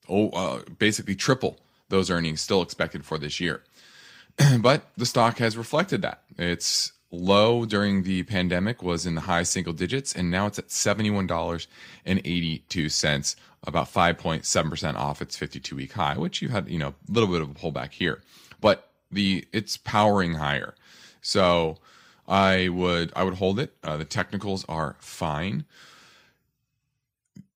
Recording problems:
none

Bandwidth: 15.5 kHz